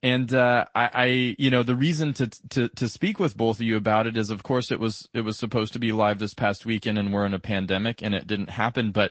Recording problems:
high frequencies cut off; noticeable; nothing above 8 kHz
garbled, watery; slightly

